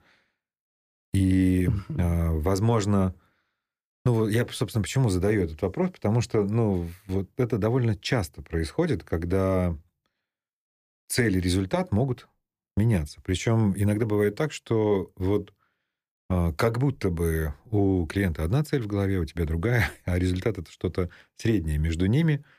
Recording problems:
none

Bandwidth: 15 kHz